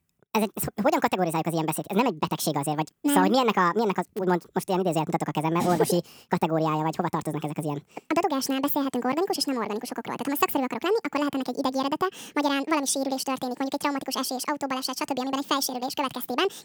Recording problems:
wrong speed and pitch; too fast and too high; 1.6 times normal speed

